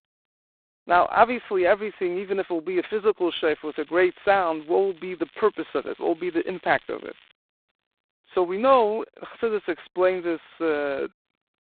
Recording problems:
phone-call audio; poor line; nothing above 4 kHz
crackling; faint; from 3.5 to 7.5 s; 30 dB below the speech

